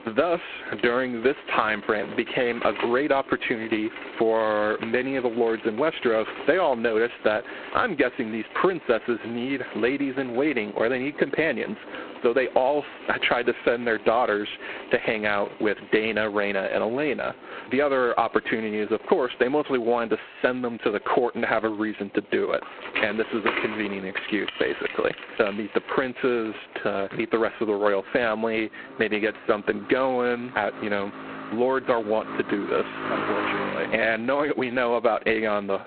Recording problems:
phone-call audio; poor line; nothing above 4 kHz
squashed, flat; somewhat, background pumping
traffic noise; noticeable; throughout; 10 dB below the speech

